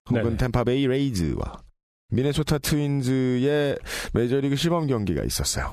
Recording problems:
squashed, flat; heavily

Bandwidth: 14.5 kHz